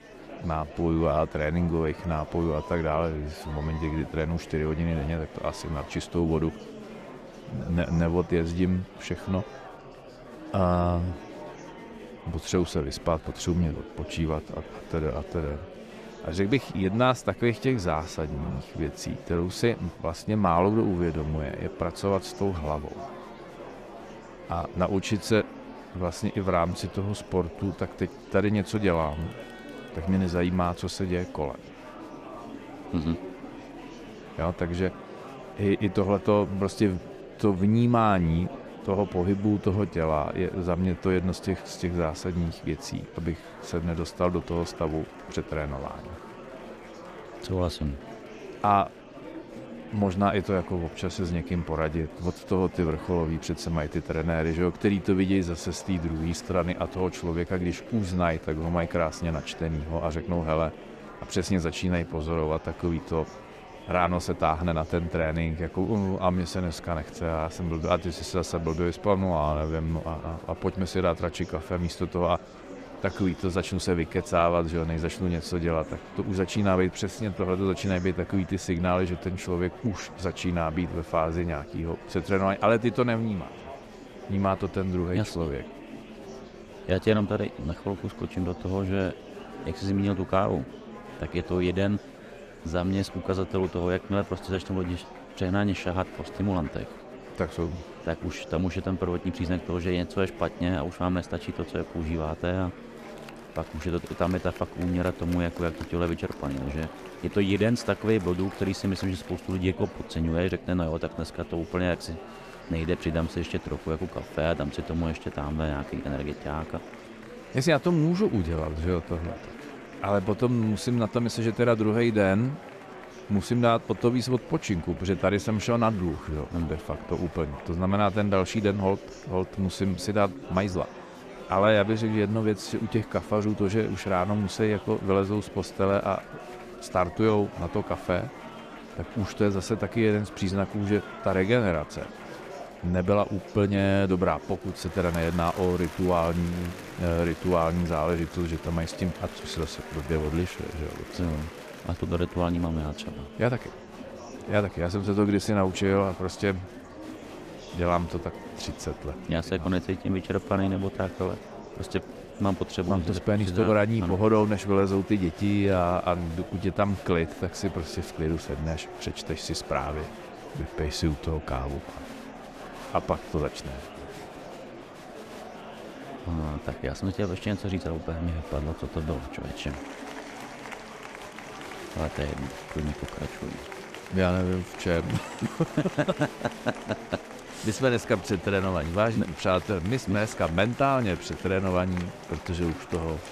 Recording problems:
murmuring crowd; noticeable; throughout; 15 dB below the speech

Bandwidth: 14.5 kHz